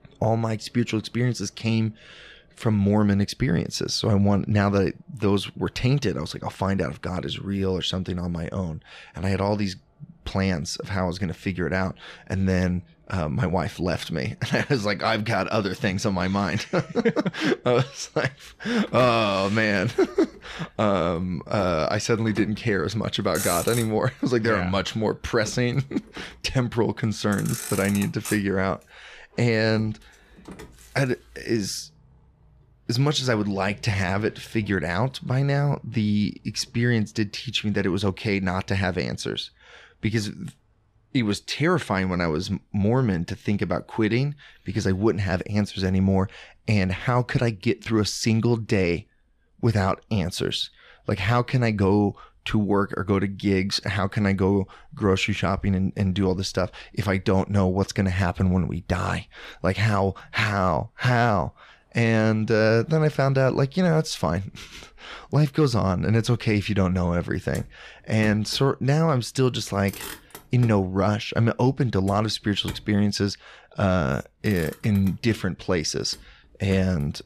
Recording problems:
traffic noise; noticeable; throughout; 15 dB below the speech

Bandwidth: 14.5 kHz